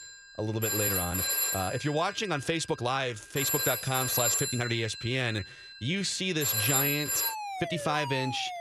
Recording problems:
alarms or sirens; very loud; throughout; 2 dB above the speech
uneven, jittery; strongly; from 1 to 8 s

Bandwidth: 14 kHz